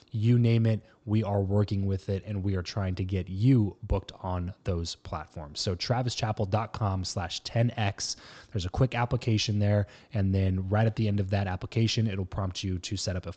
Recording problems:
high frequencies cut off; noticeable; nothing above 8 kHz

